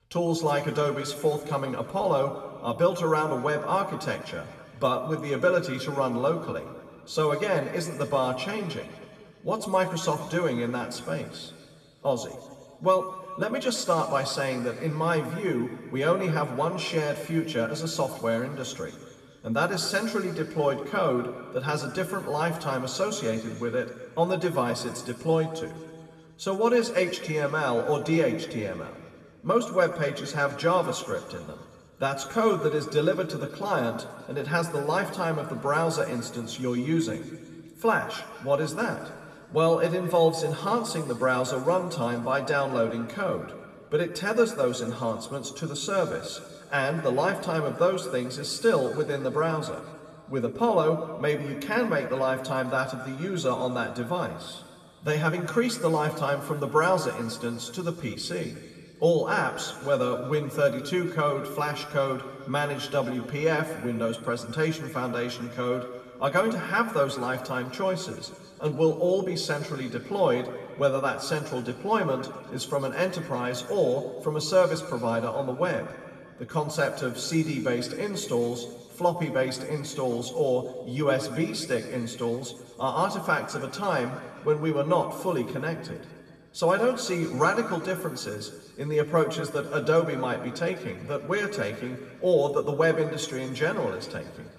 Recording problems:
room echo; noticeable; dies away in 1.9 s
off-mic speech; somewhat distant

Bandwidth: 14 kHz